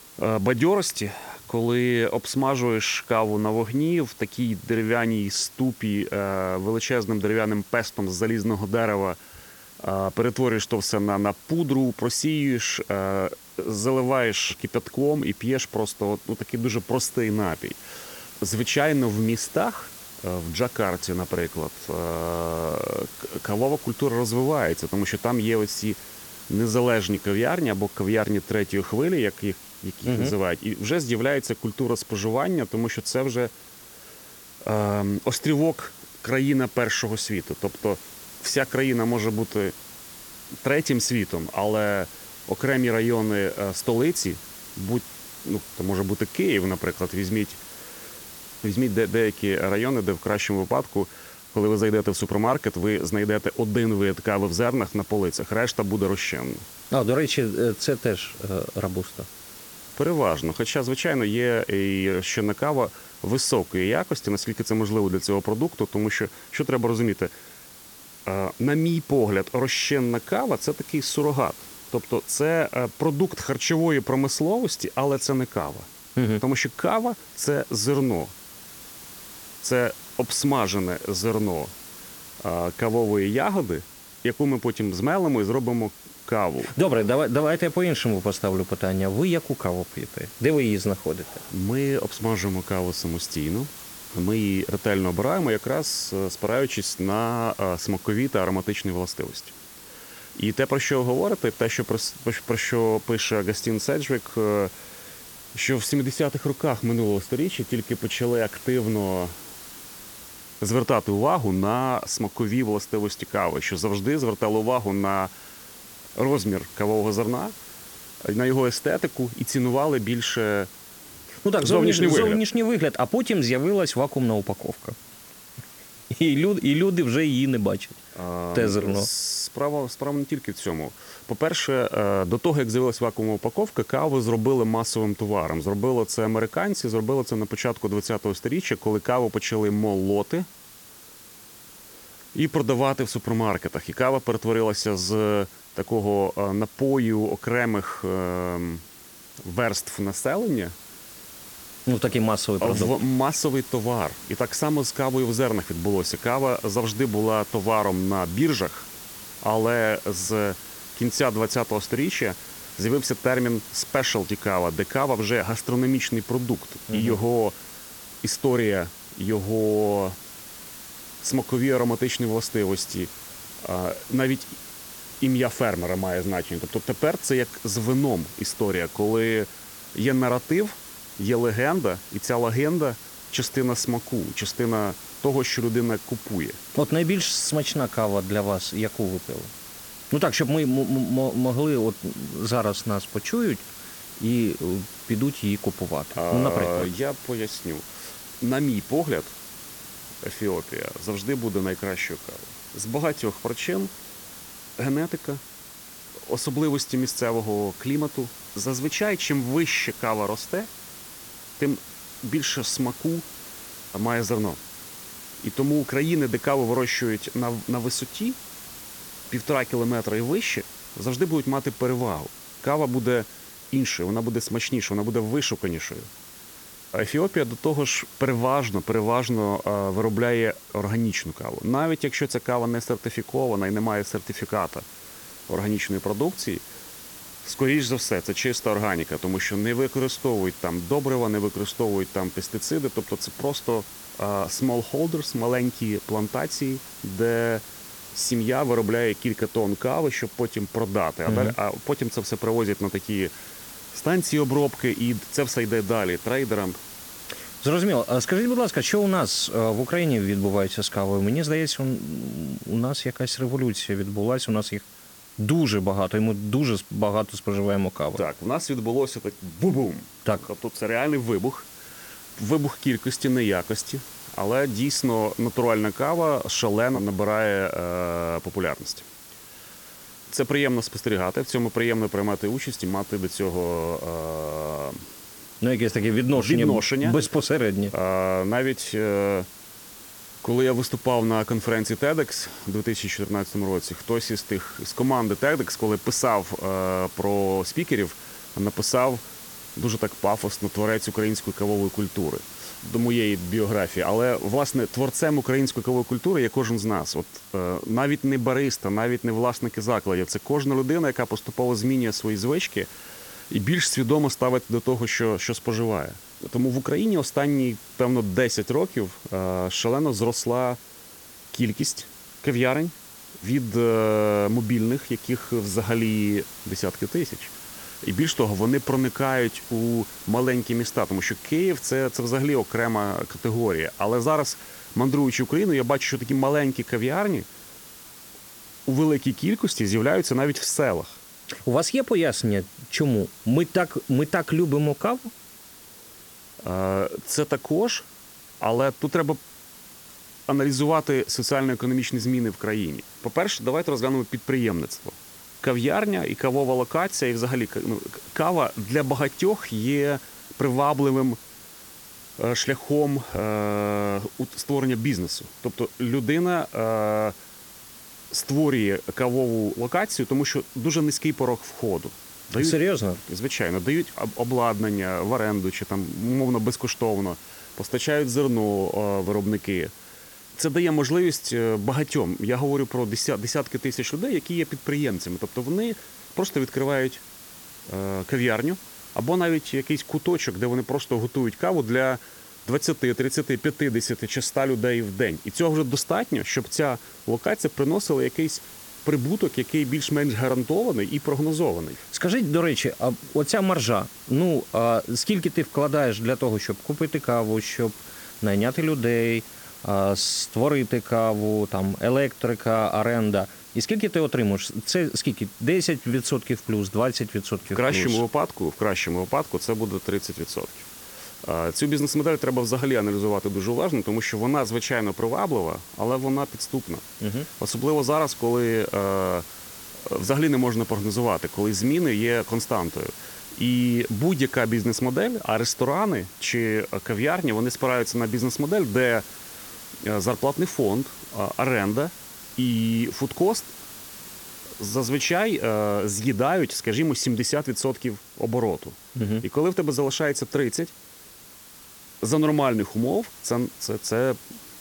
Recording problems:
hiss; noticeable; throughout; 15 dB below the speech

